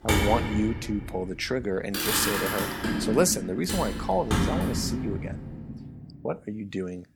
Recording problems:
traffic noise; loud; until 5.5 s; as loud as the speech

